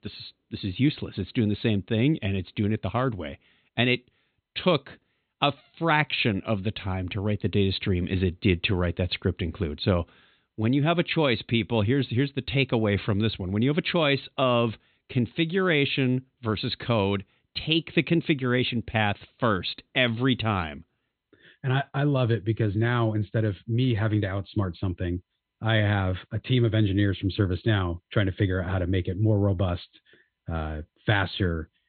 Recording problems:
high frequencies cut off; severe; nothing above 4 kHz

